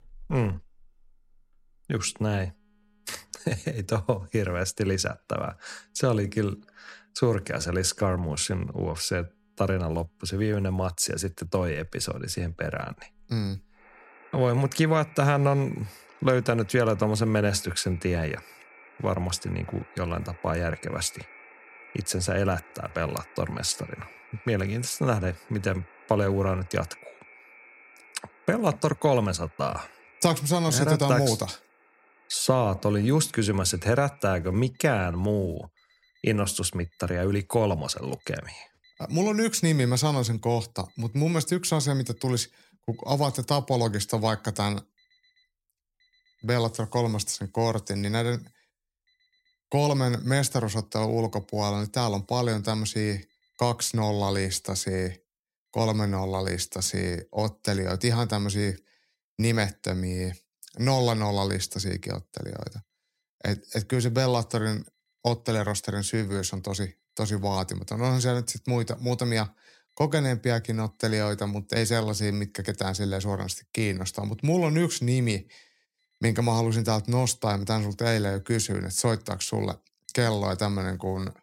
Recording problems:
alarms or sirens; faint; throughout; 25 dB below the speech

